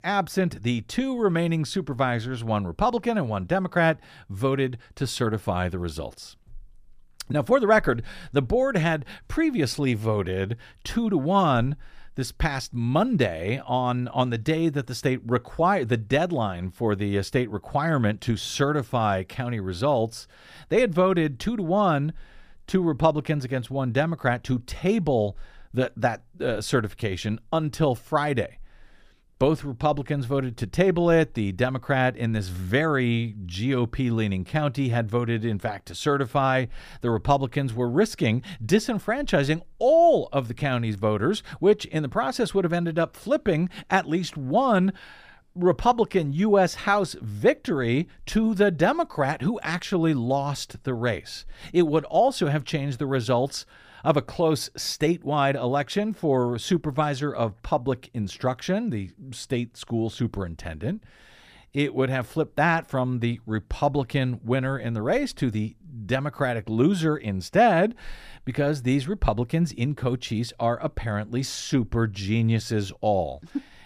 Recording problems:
none

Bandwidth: 15 kHz